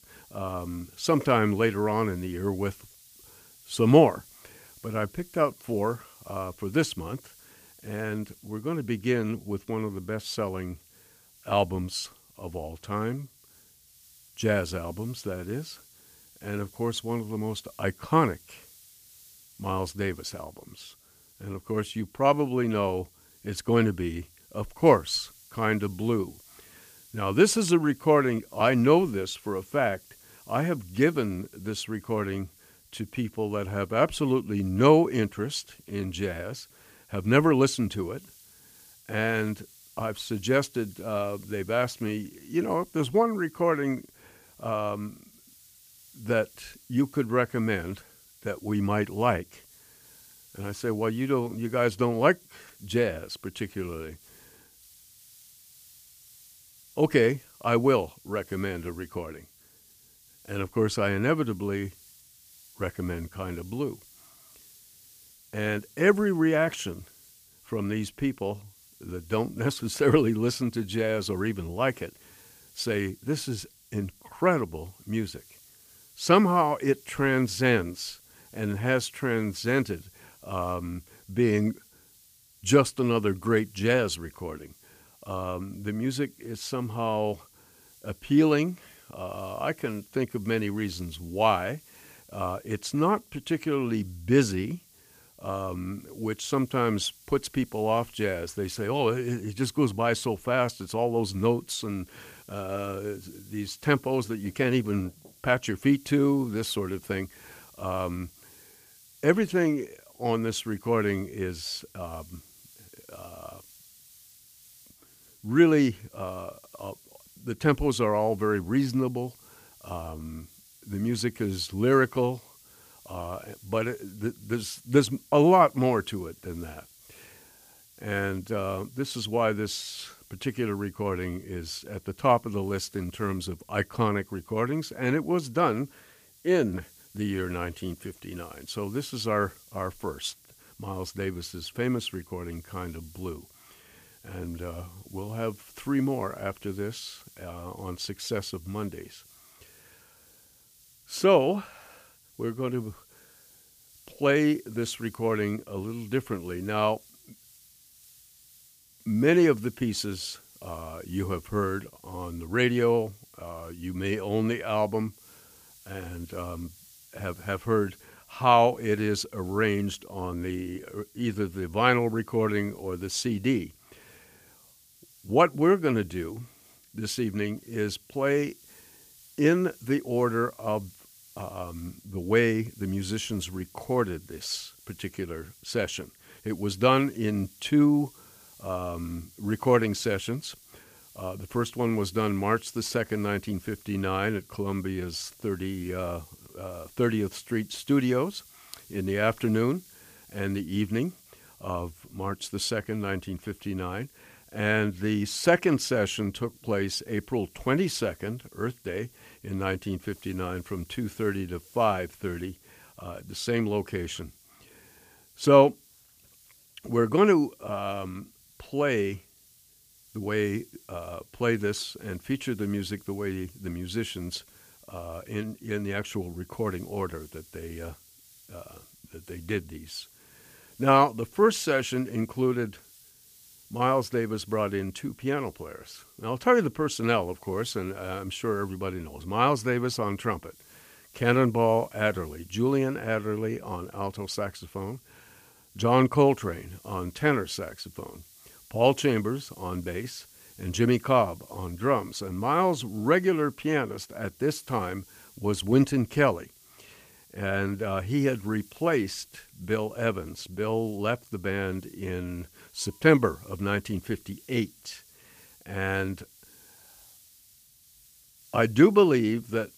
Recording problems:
hiss; faint; throughout; 25 dB below the speech

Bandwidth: 15 kHz